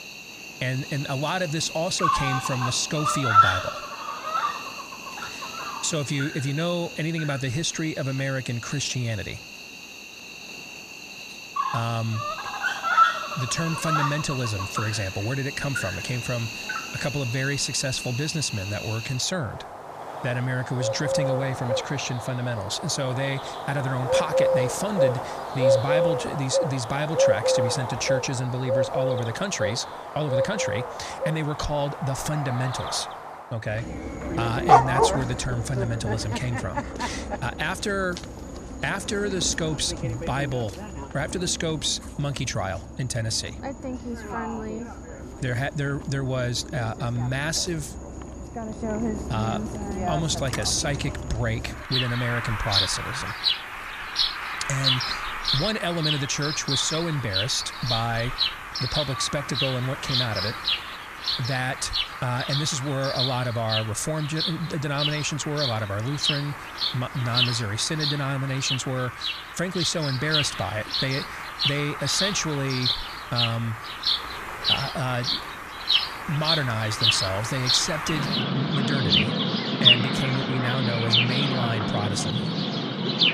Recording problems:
animal sounds; very loud; throughout; 1 dB above the speech

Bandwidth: 15 kHz